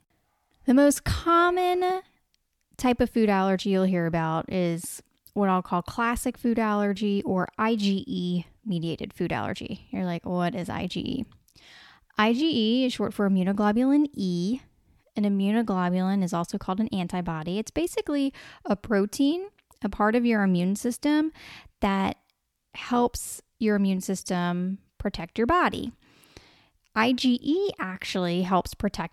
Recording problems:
none

